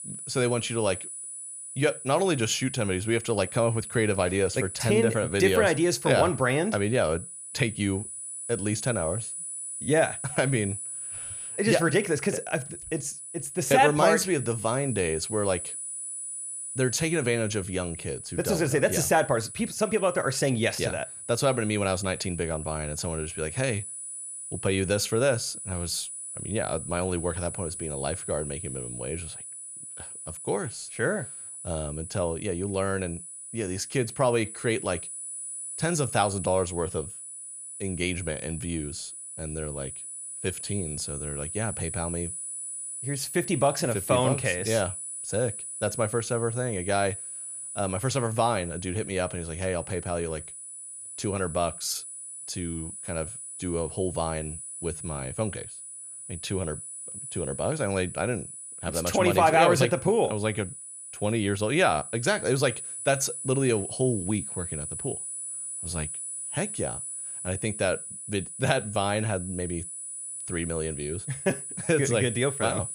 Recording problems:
high-pitched whine; loud; throughout; 10 kHz, 8 dB below the speech

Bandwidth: 14.5 kHz